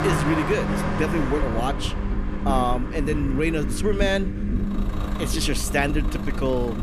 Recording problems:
traffic noise; loud; throughout; 7 dB below the speech
low rumble; noticeable; throughout; 10 dB below the speech

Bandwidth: 14.5 kHz